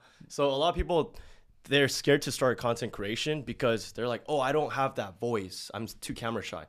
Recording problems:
none

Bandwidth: 14.5 kHz